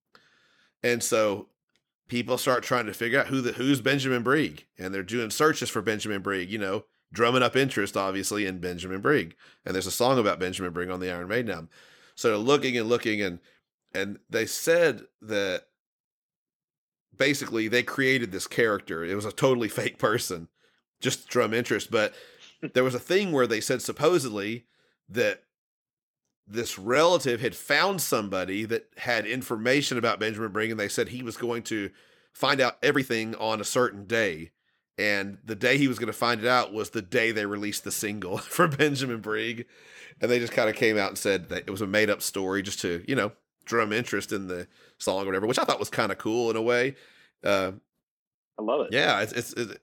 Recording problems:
uneven, jittery; strongly; from 2 to 46 s

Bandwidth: 17.5 kHz